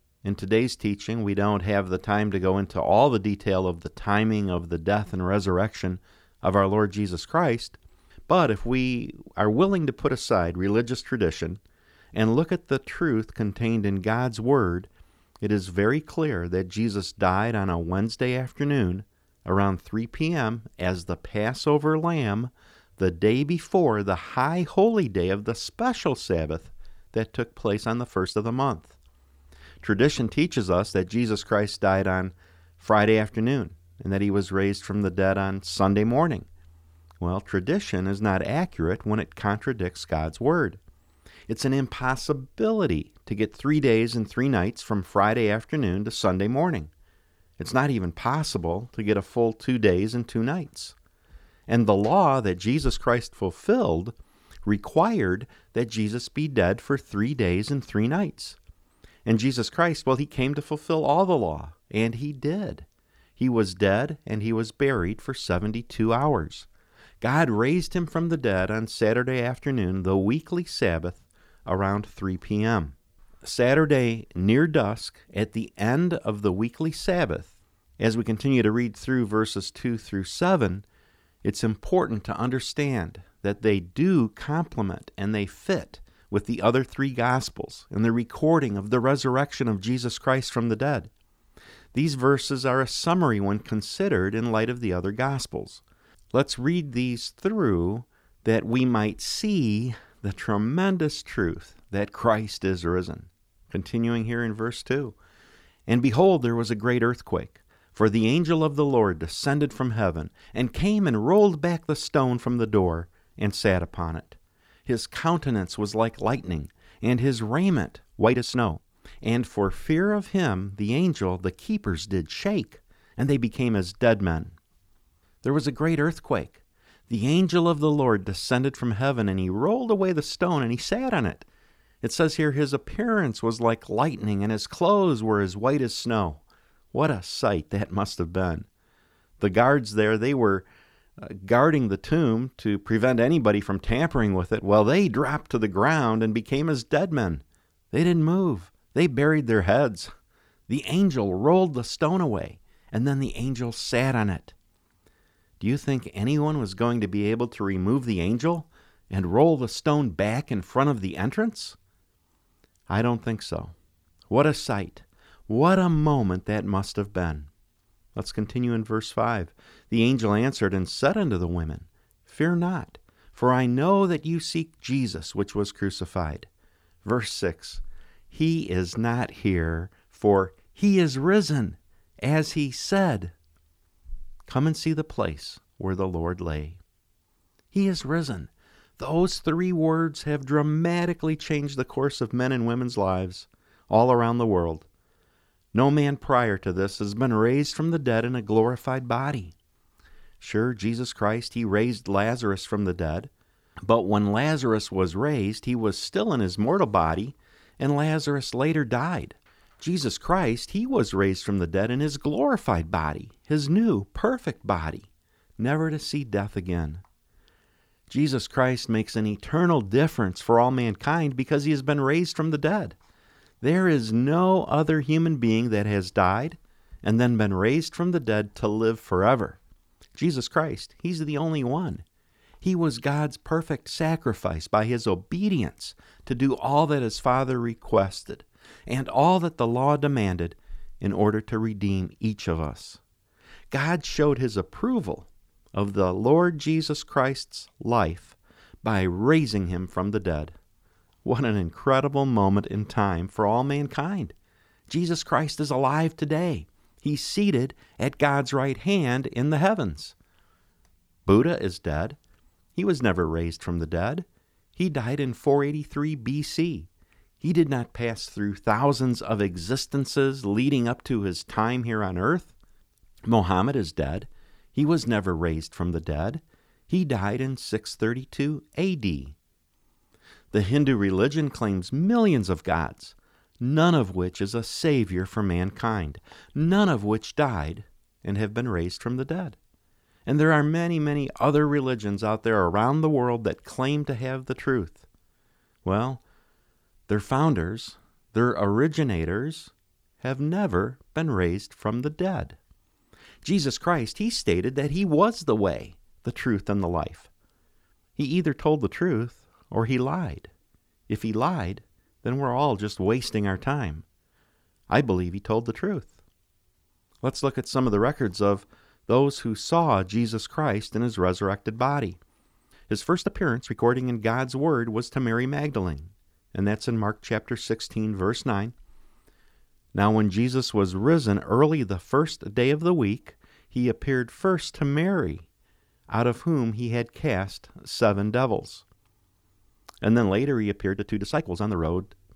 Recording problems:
uneven, jittery; strongly; from 4.5 s to 5:42

